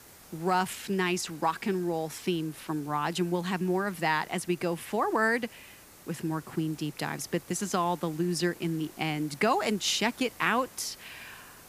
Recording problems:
hiss; faint; throughout; 20 dB below the speech

